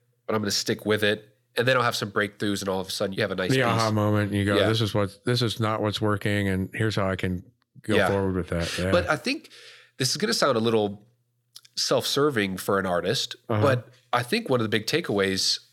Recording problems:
none

